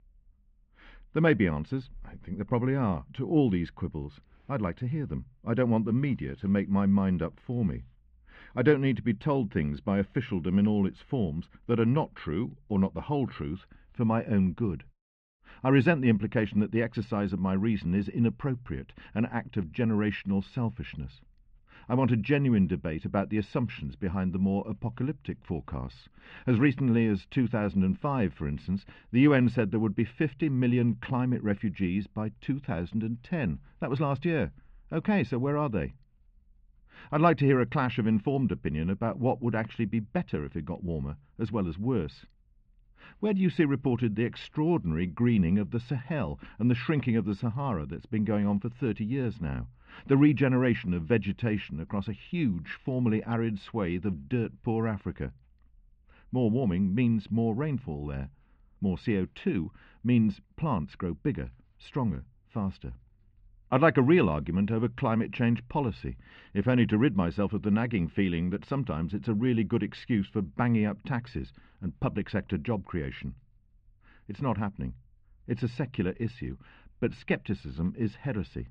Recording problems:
muffled; very; fading above 2.5 kHz

